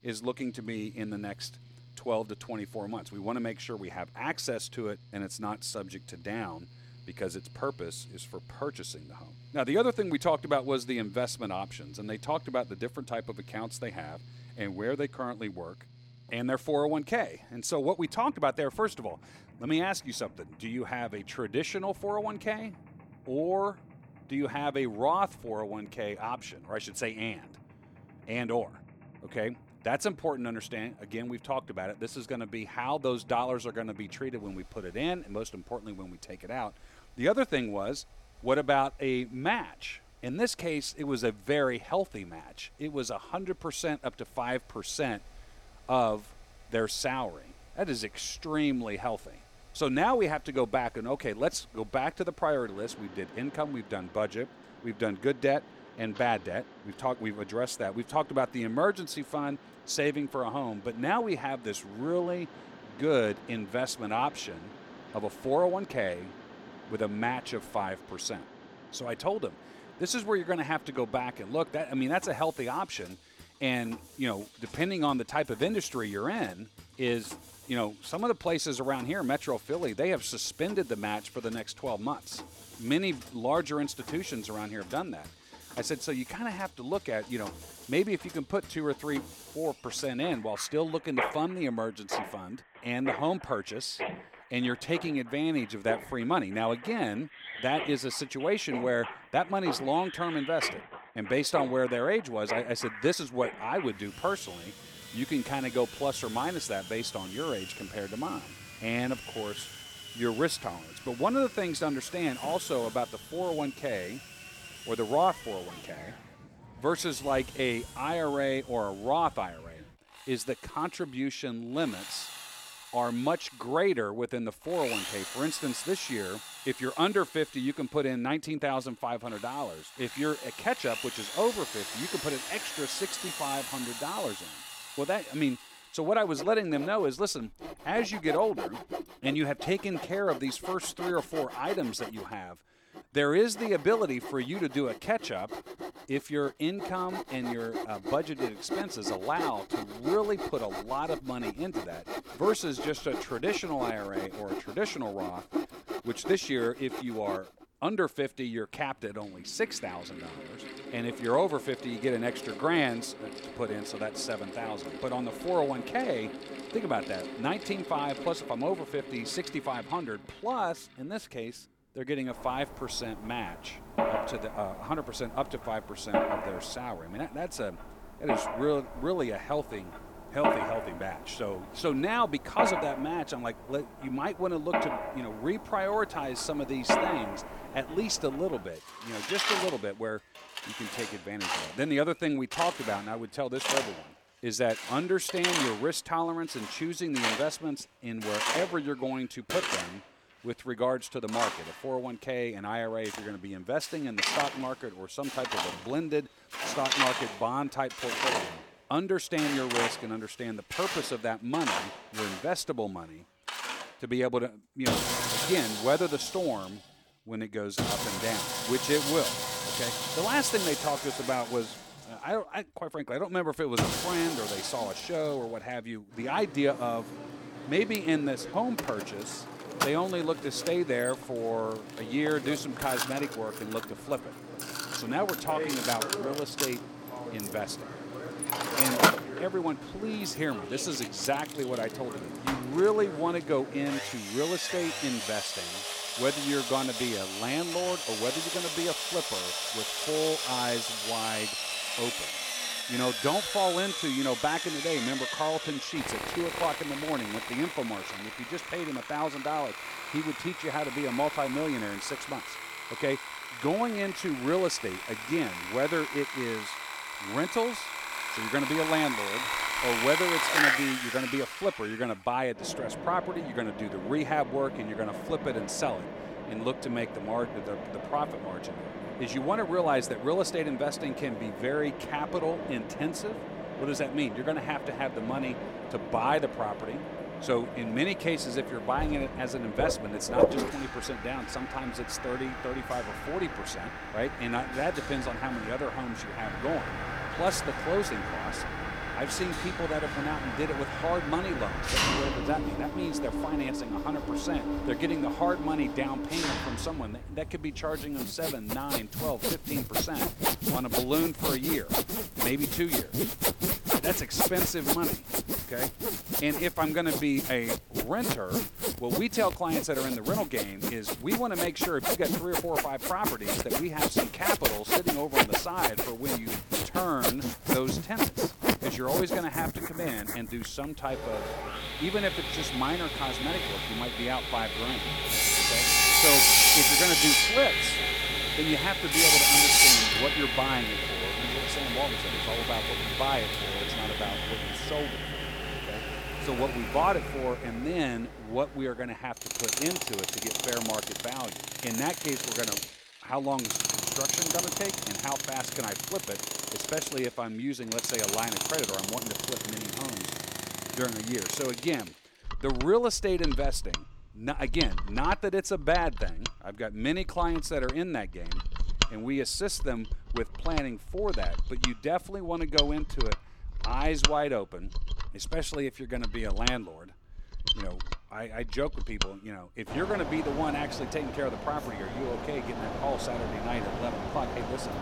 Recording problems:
machinery noise; very loud; throughout; 1 dB above the speech

